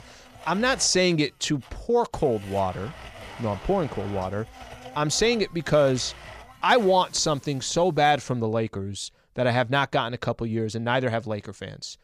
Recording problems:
household noises; noticeable; until 8 s; 20 dB below the speech

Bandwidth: 15 kHz